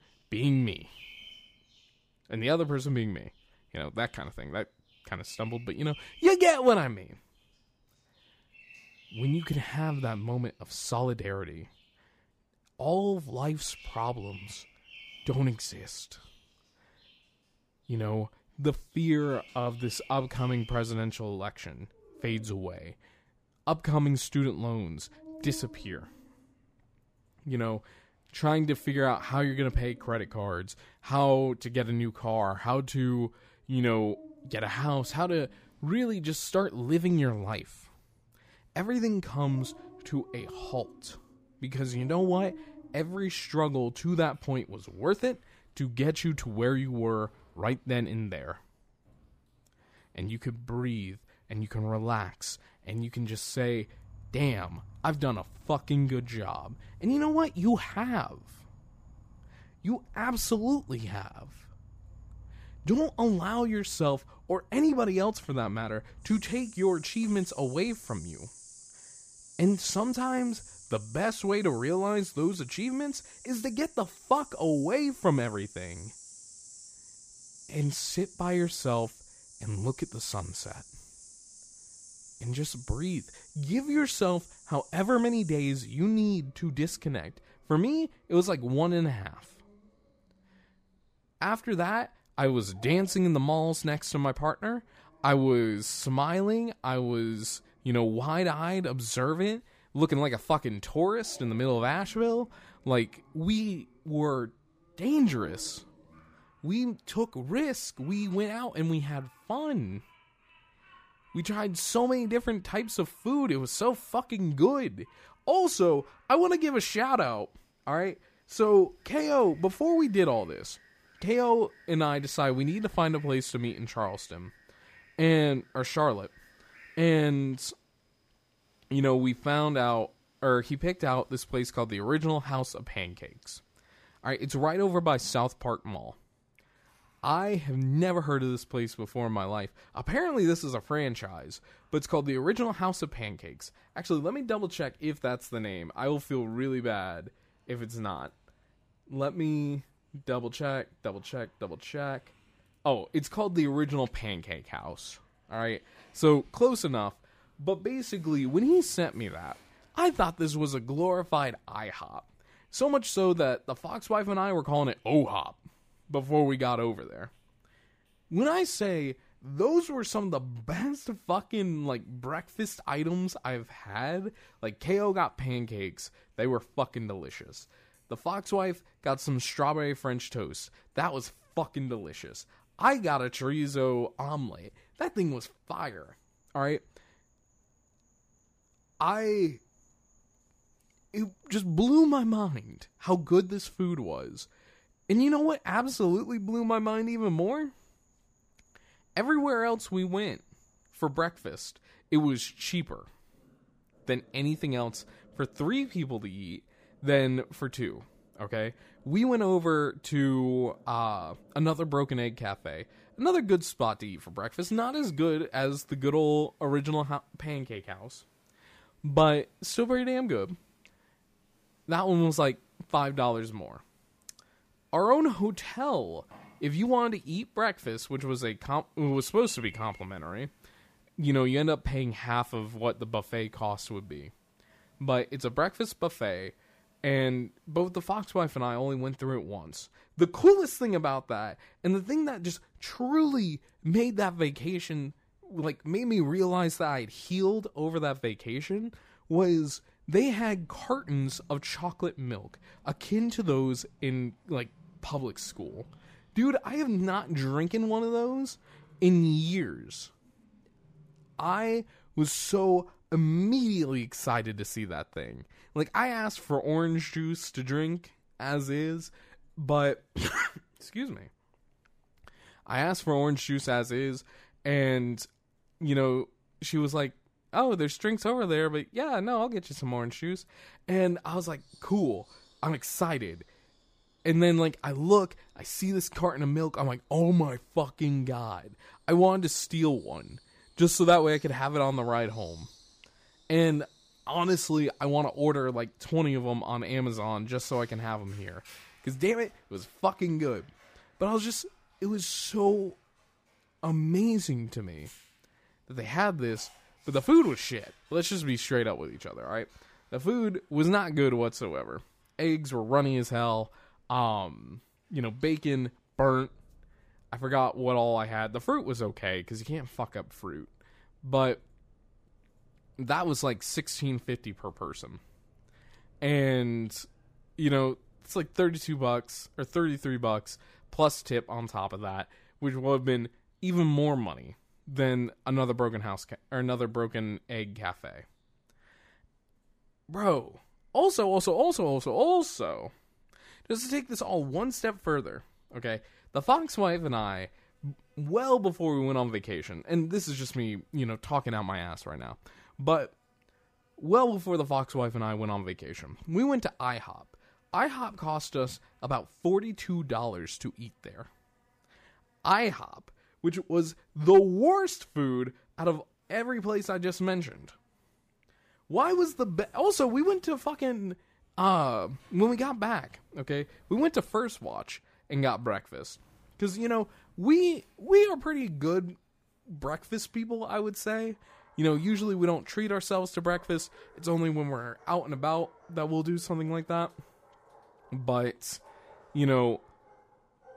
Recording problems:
animal sounds; faint; throughout; 25 dB below the speech

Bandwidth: 15 kHz